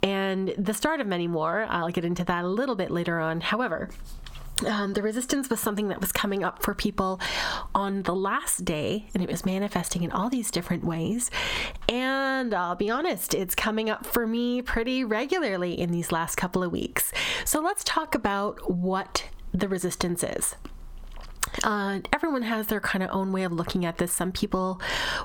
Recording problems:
squashed, flat; heavily

